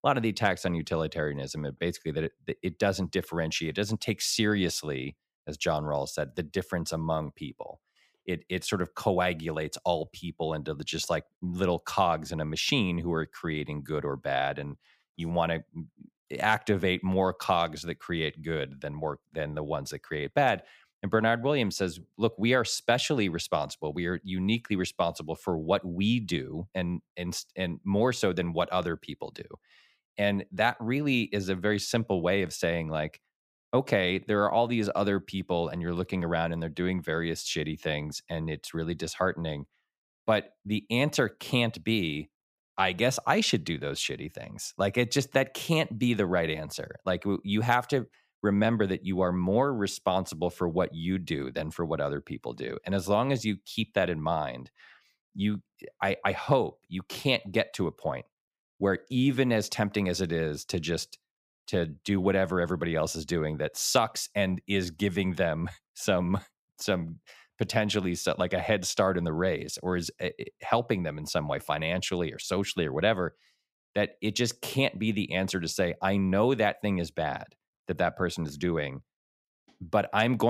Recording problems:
abrupt cut into speech; at the end

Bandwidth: 15 kHz